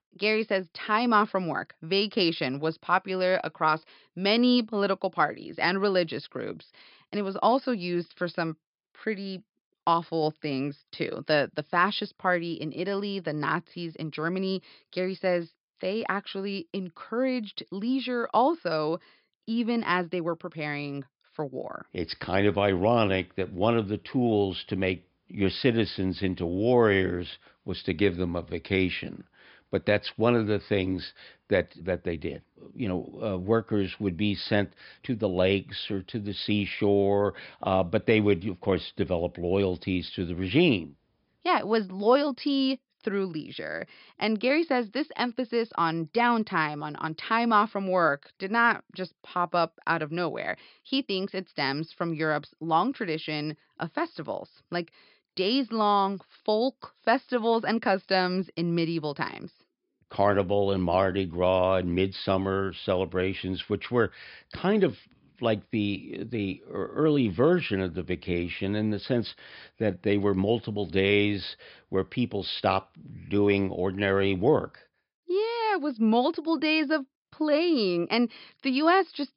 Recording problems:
high frequencies cut off; noticeable; nothing above 5.5 kHz

